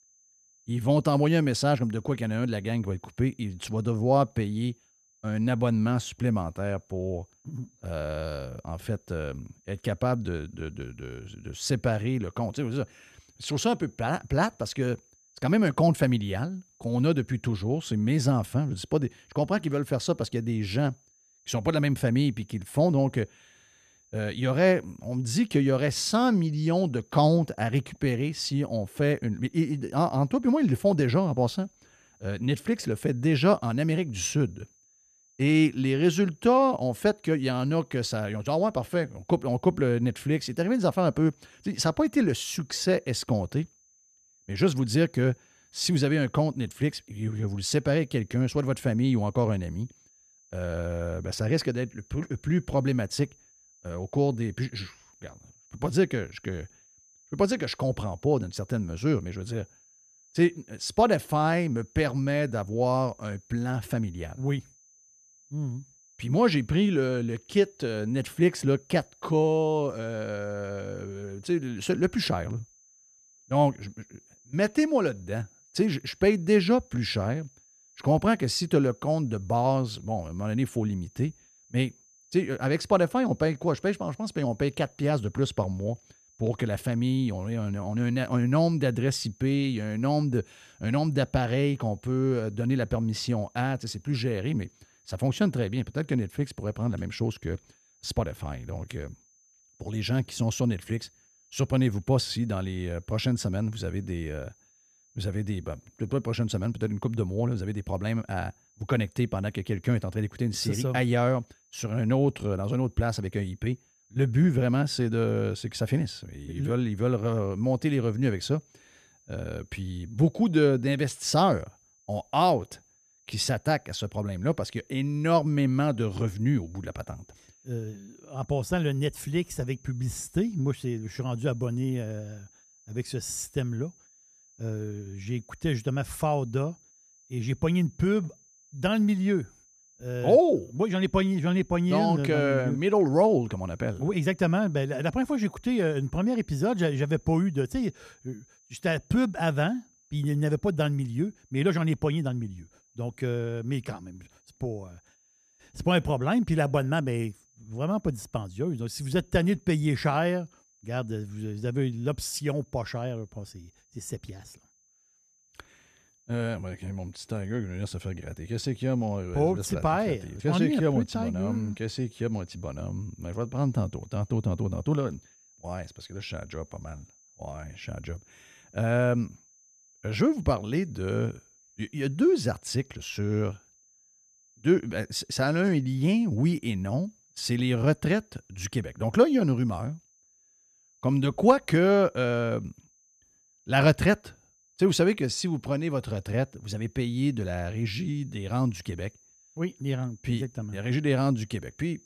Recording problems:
high-pitched whine; faint; throughout; 6 kHz, 30 dB below the speech

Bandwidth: 14.5 kHz